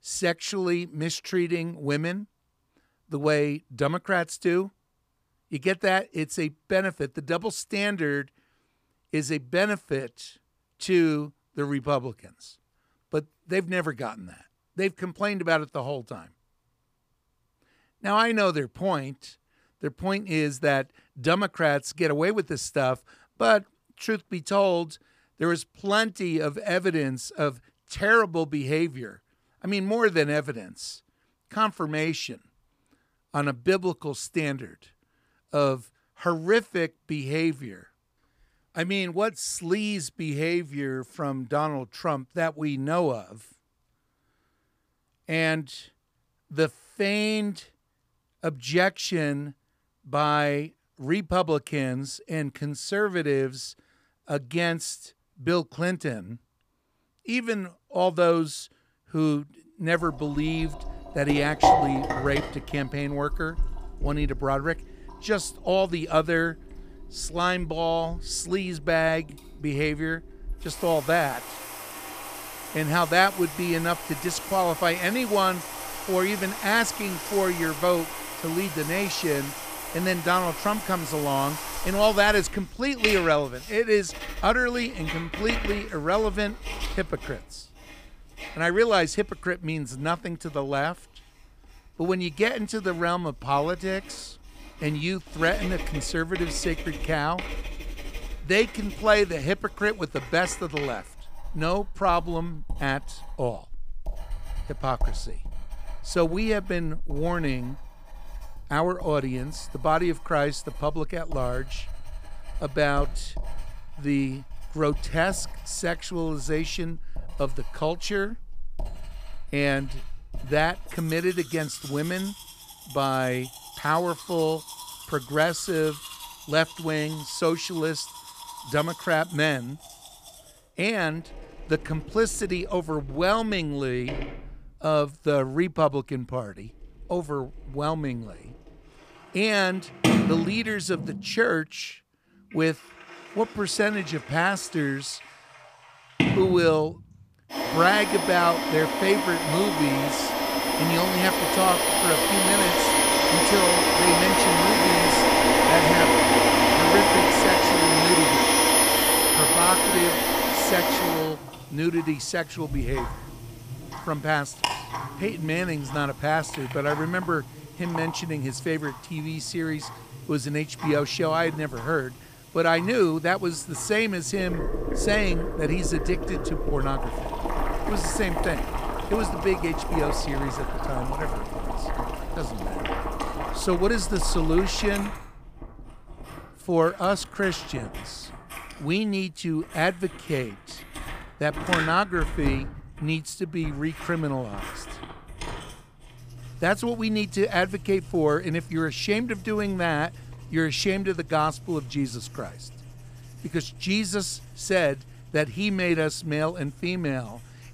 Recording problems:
household noises; very loud; from 1:00 on; 1 dB above the speech

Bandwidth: 15 kHz